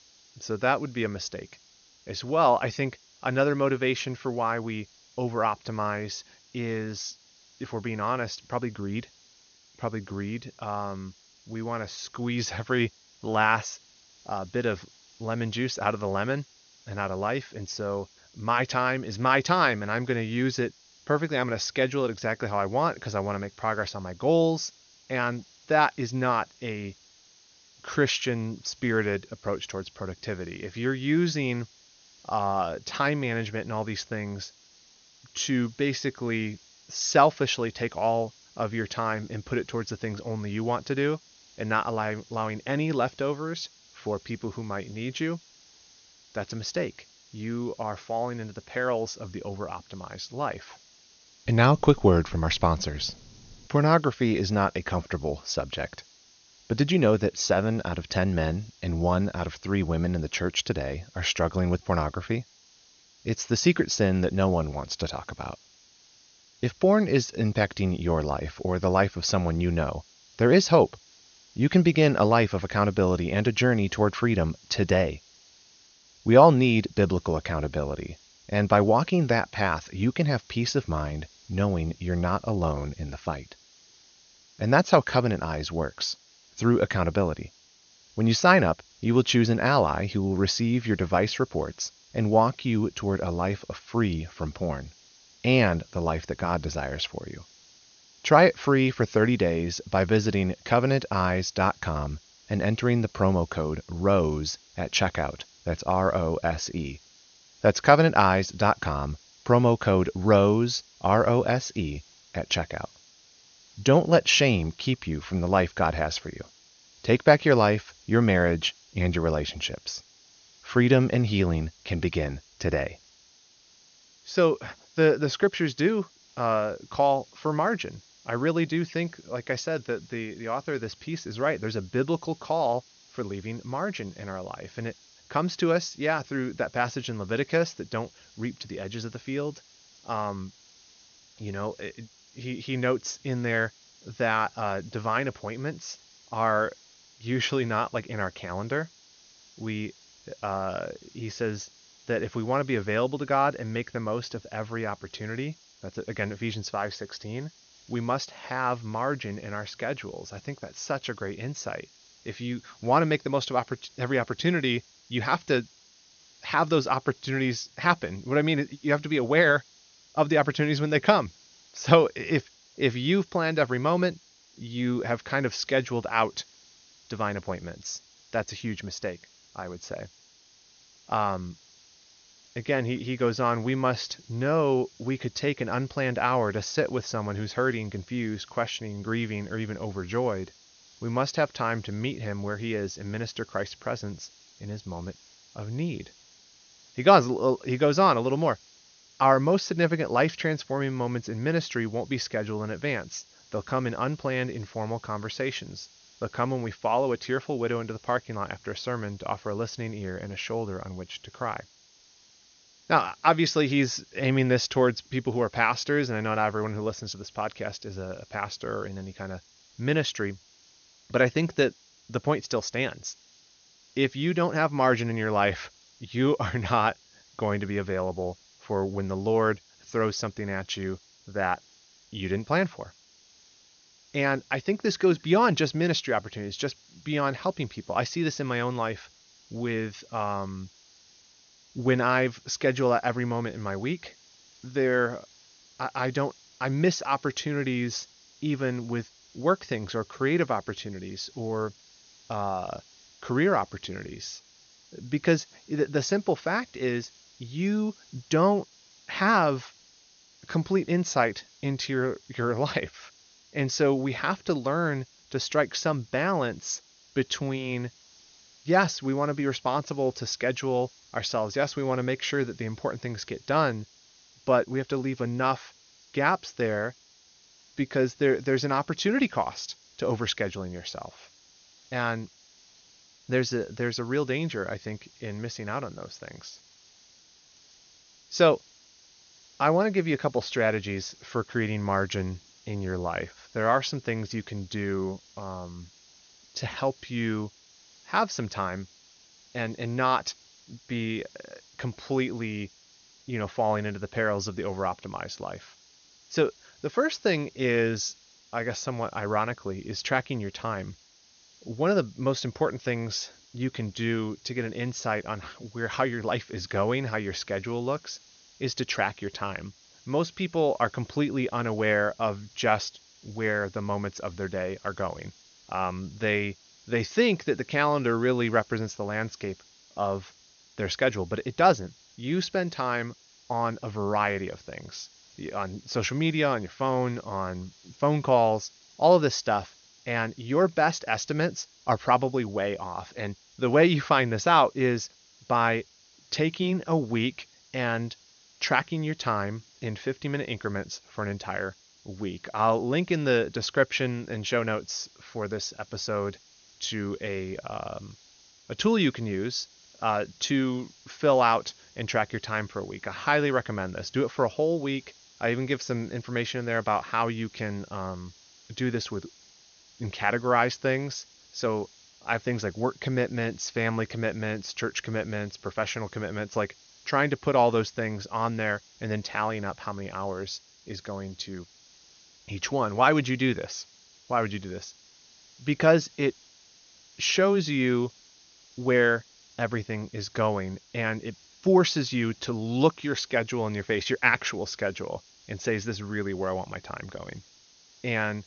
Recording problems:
high frequencies cut off; noticeable; nothing above 6.5 kHz
hiss; faint; throughout; 25 dB below the speech

